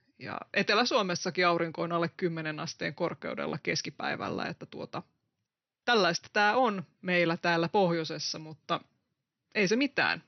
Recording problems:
high frequencies cut off; noticeable; nothing above 6 kHz

